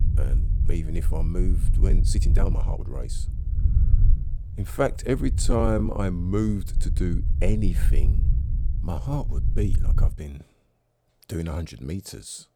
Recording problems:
low rumble; noticeable; until 10 s; 10 dB below the speech
uneven, jittery; strongly; from 2 to 12 s

